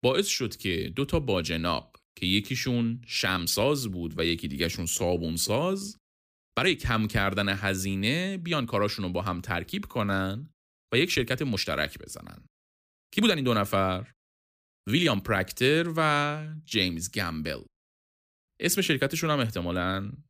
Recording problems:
uneven, jittery; strongly; from 0.5 to 19 s

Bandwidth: 15 kHz